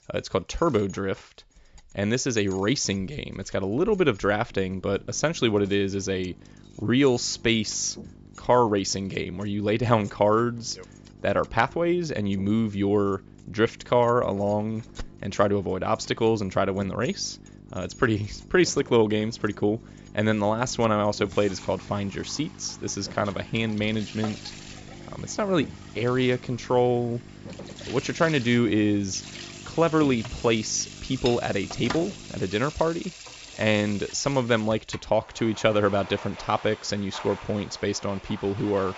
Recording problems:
high frequencies cut off; noticeable; nothing above 8 kHz
household noises; noticeable; throughout; 15 dB below the speech
electrical hum; faint; from 4.5 to 32 s; 50 Hz, 25 dB below the speech

